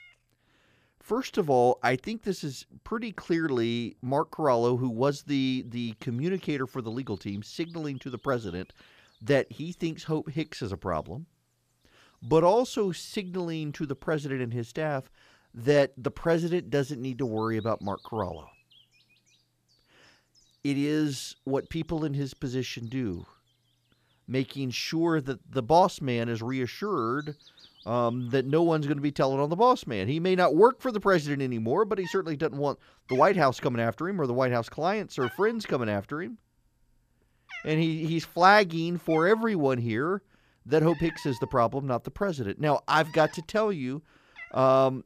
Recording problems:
animal sounds; faint; throughout; 20 dB below the speech

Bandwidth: 14.5 kHz